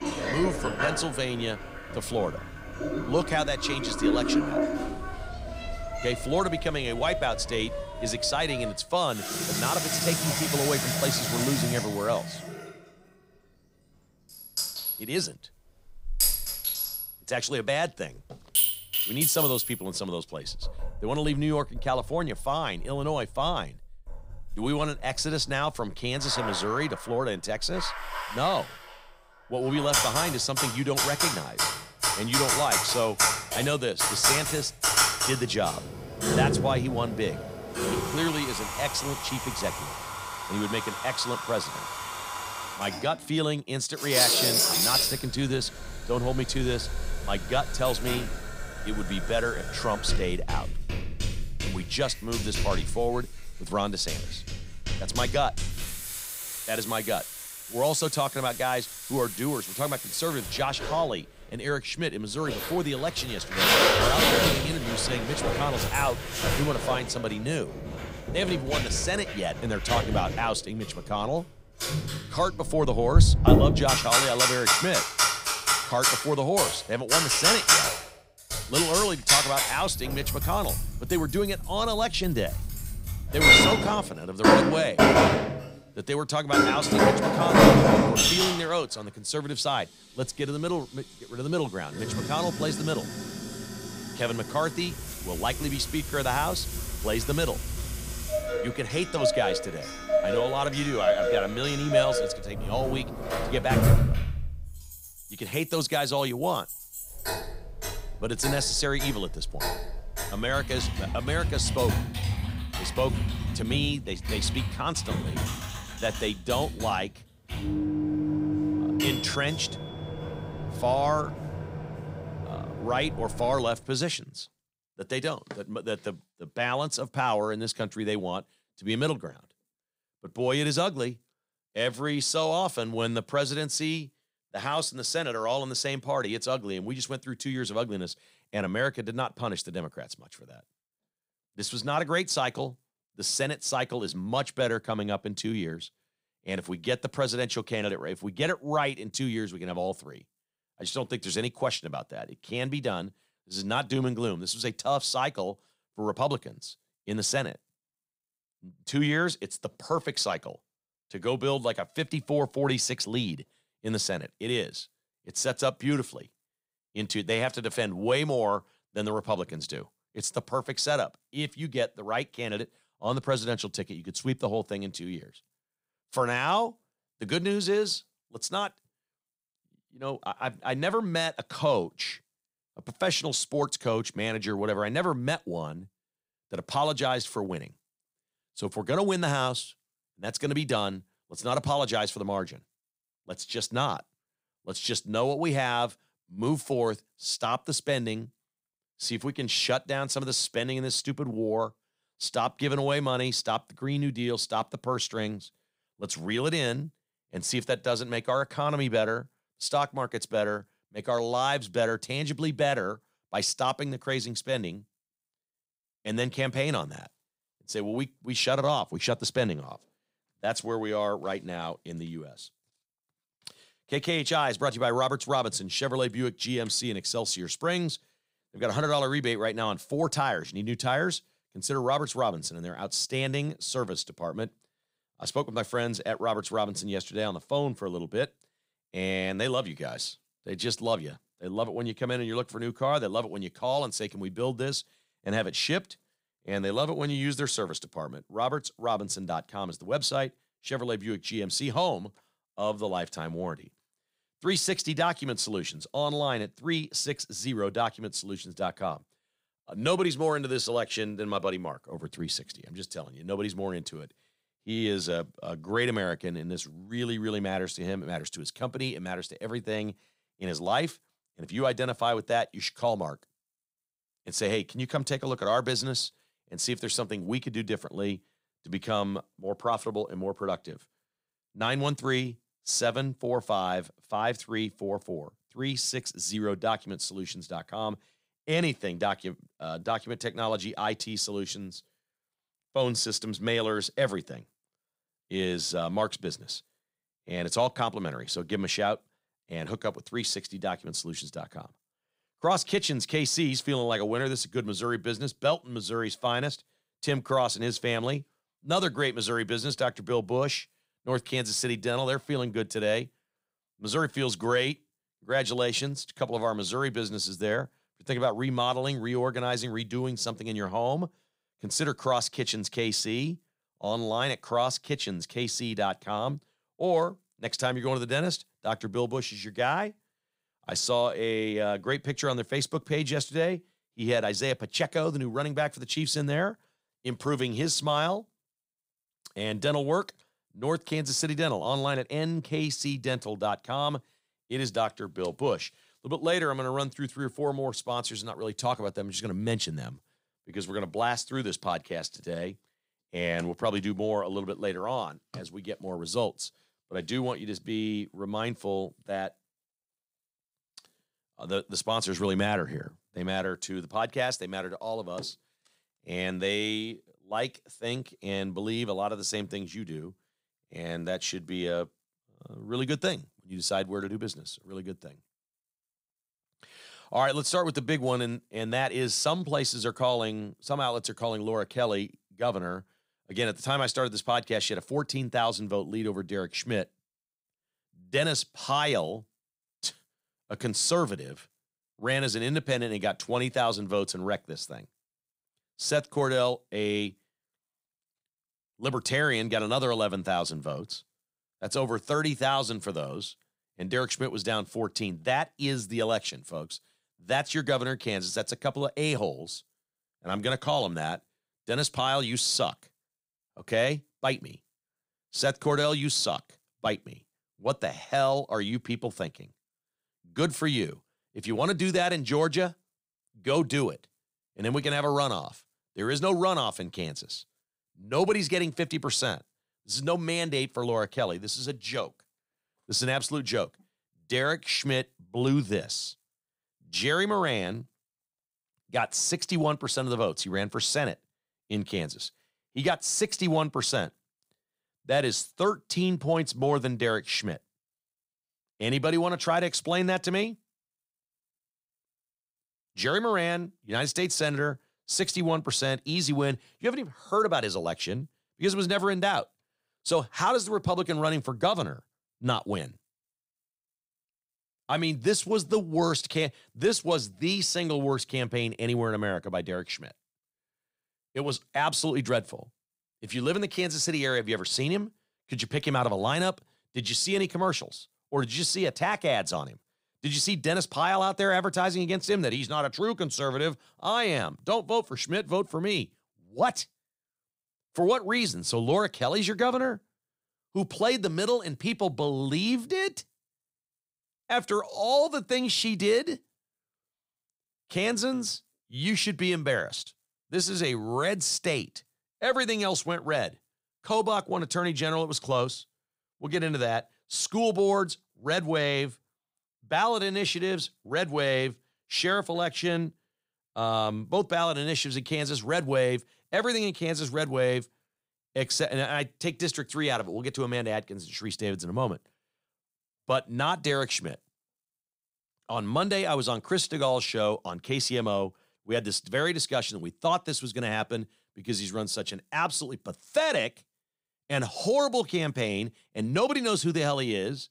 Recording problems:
household noises; very loud; until 2:04; 3 dB above the speech

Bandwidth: 15.5 kHz